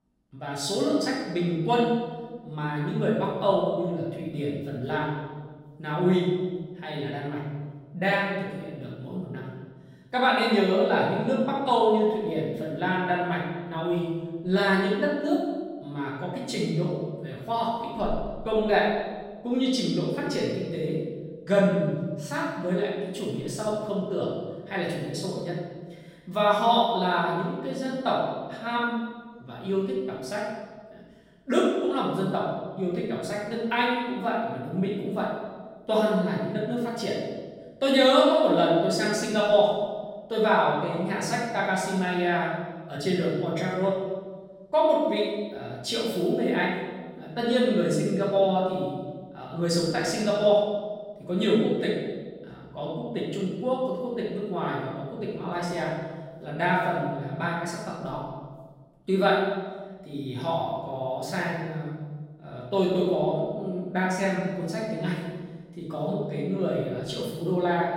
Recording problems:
off-mic speech; far
room echo; noticeable; dies away in 1.3 s

